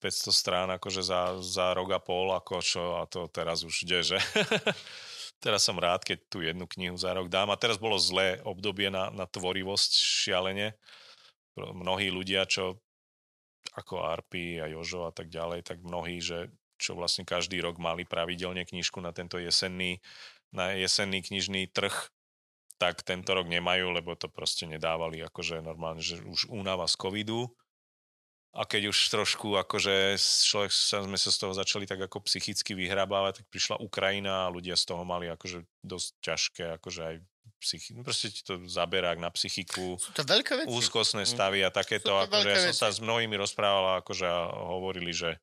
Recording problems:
thin; somewhat; fading below 800 Hz

